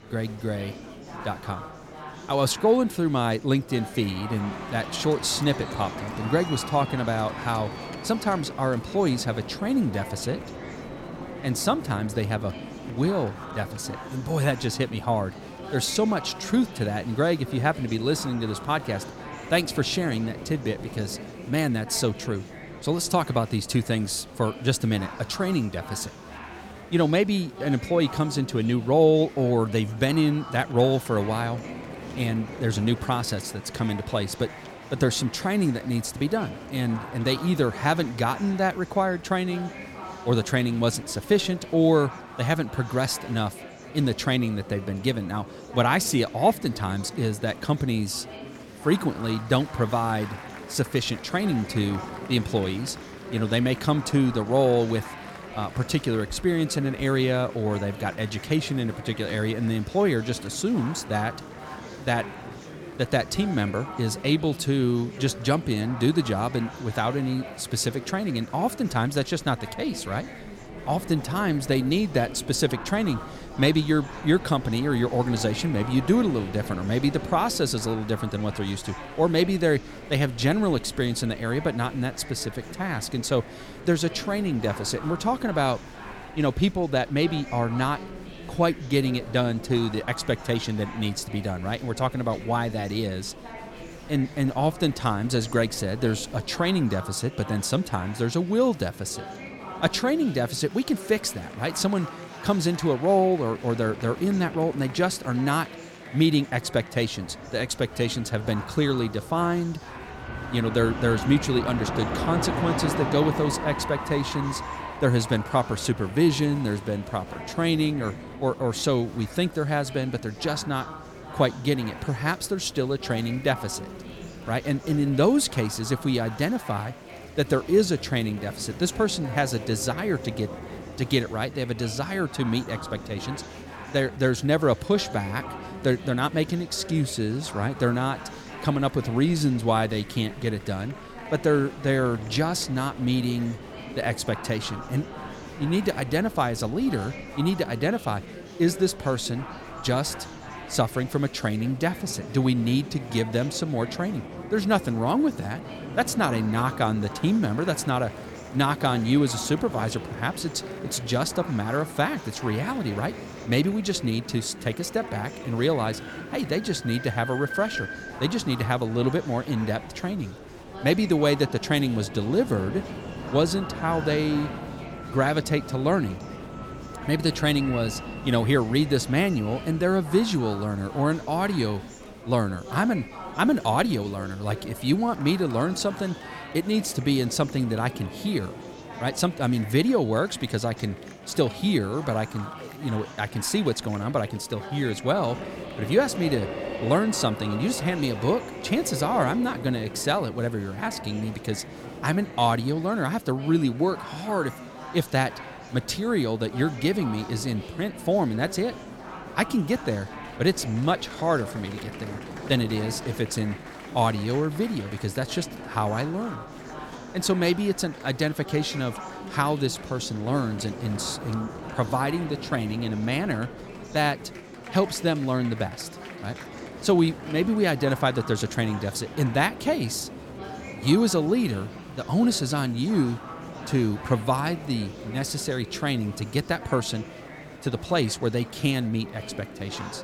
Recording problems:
train or aircraft noise; noticeable; throughout; 15 dB below the speech
murmuring crowd; noticeable; throughout; 15 dB below the speech

